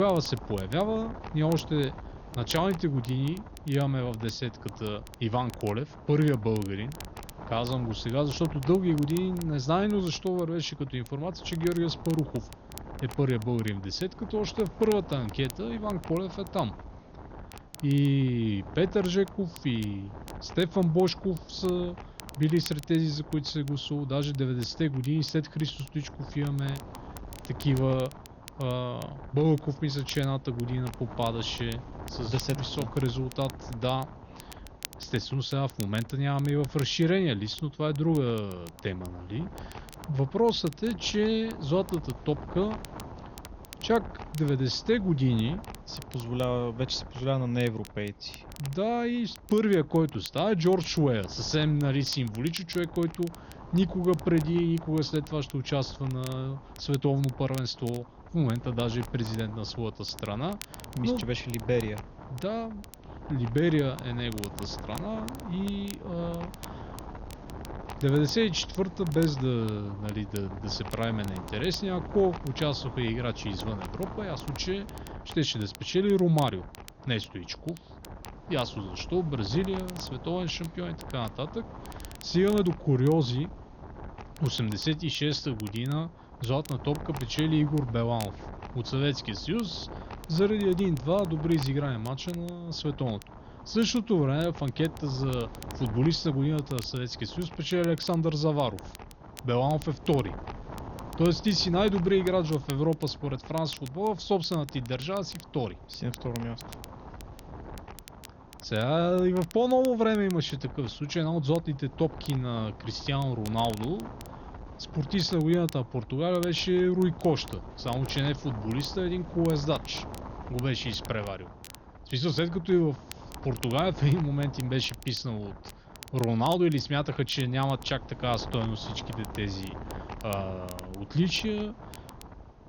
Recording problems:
garbled, watery; slightly; nothing above 6.5 kHz
wind noise on the microphone; occasional gusts; 15 dB below the speech
crackle, like an old record; faint; 20 dB below the speech
high-pitched whine; very faint; throughout; 6 kHz, 65 dB below the speech
abrupt cut into speech; at the start

